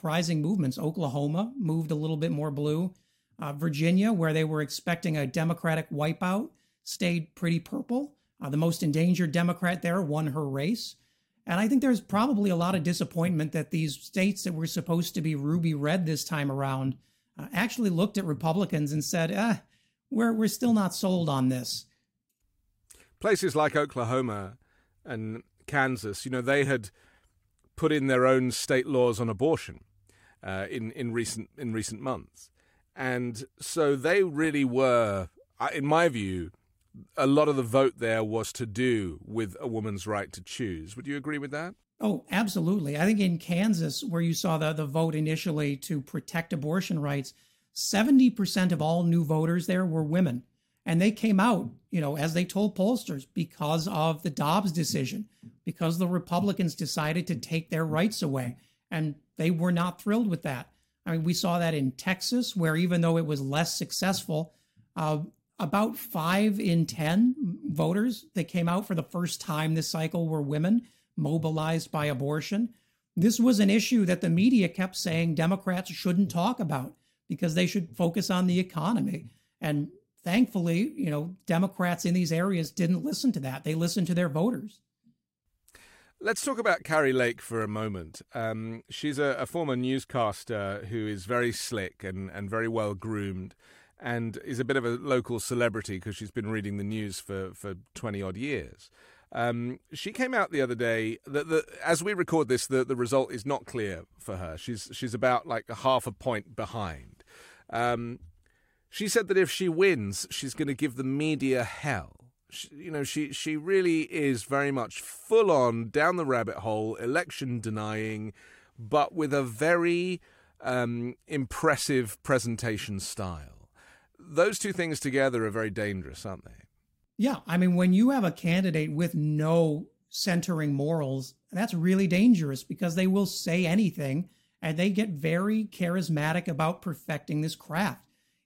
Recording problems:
none

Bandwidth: 16 kHz